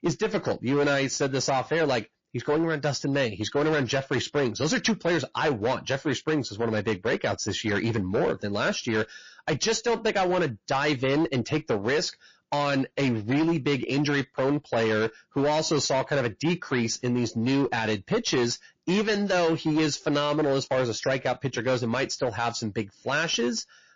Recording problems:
distortion; slight; 14% of the sound clipped
garbled, watery; slightly; nothing above 6 kHz

